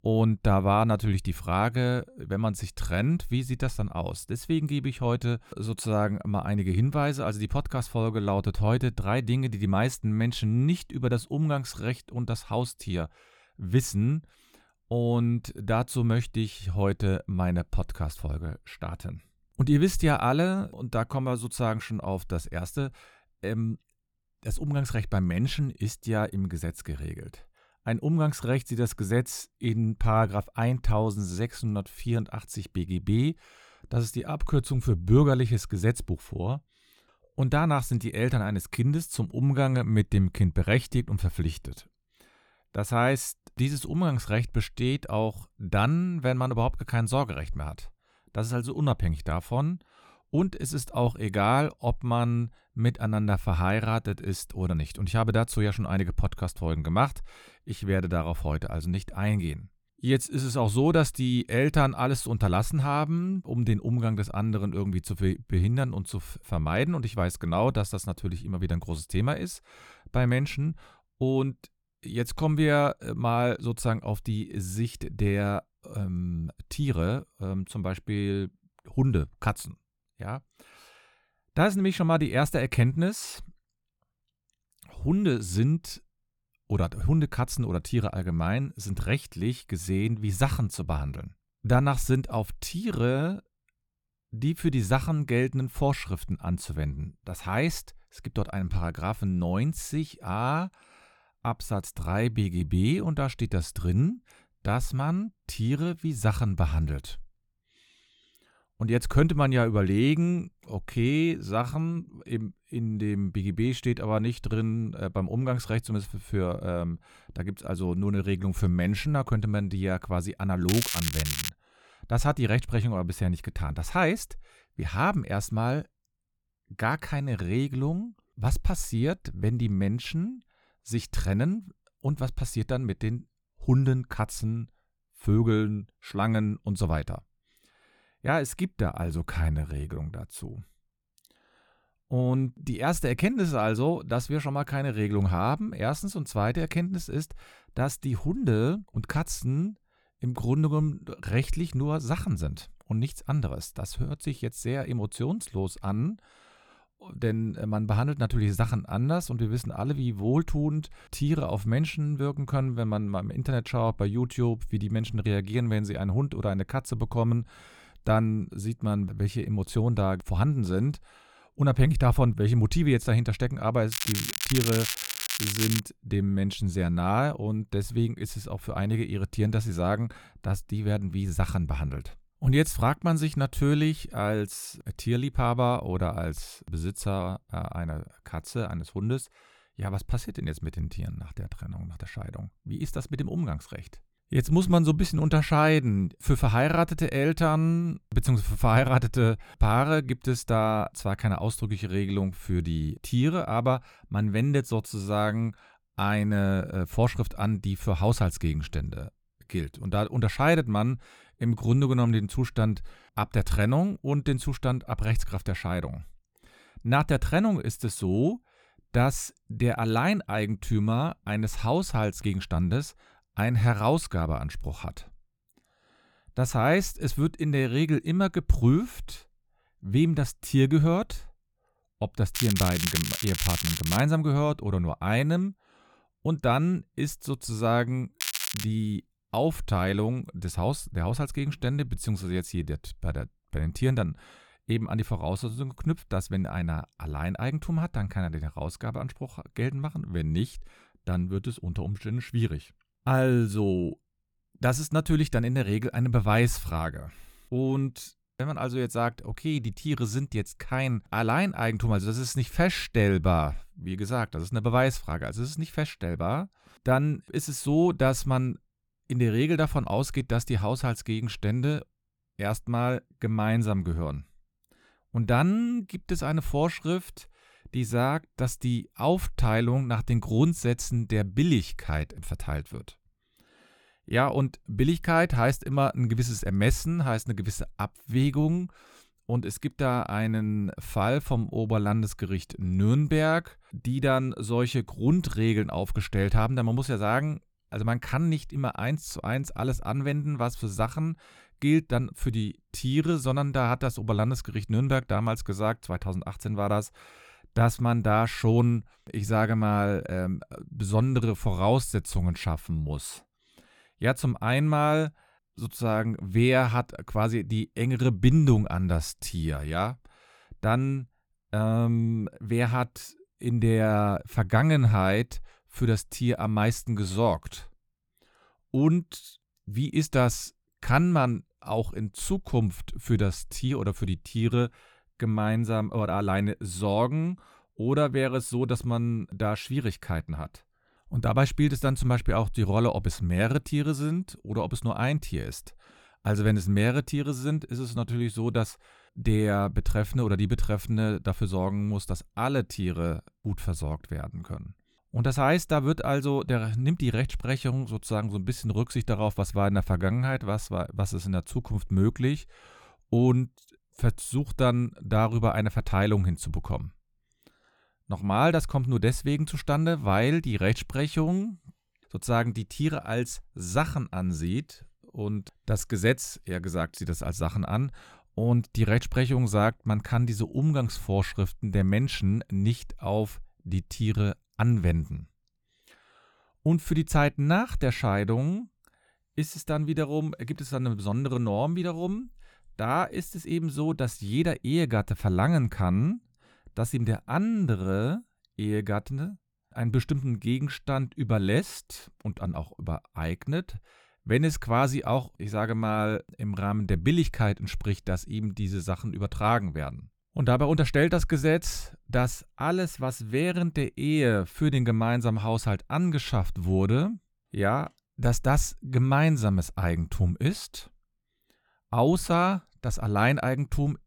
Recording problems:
crackling; loud; 4 times, first at 2:01; 2 dB below the speech

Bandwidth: 18.5 kHz